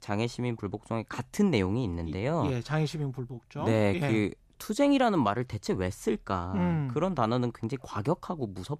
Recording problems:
none

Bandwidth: 14.5 kHz